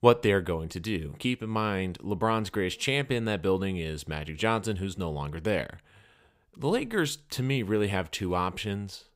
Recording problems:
none

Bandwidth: 15.5 kHz